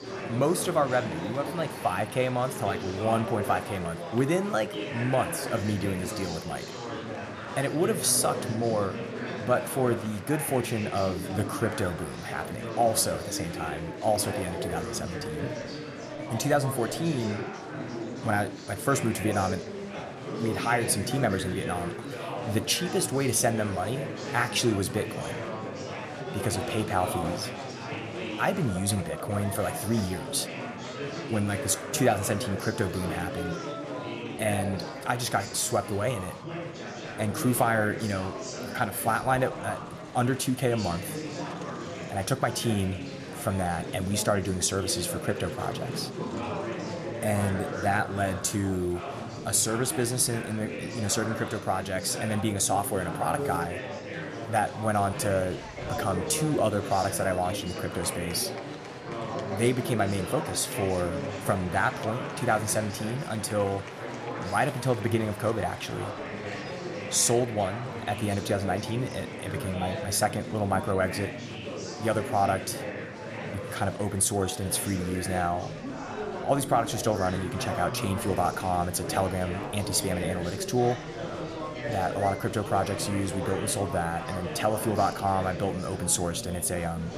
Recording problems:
murmuring crowd; loud; throughout; 7 dB below the speech

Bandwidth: 14.5 kHz